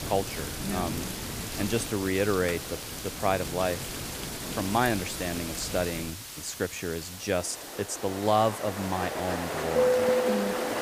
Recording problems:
rain or running water; loud; throughout; 2 dB below the speech
hiss; loud; throughout; 10 dB below the speech

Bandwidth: 15 kHz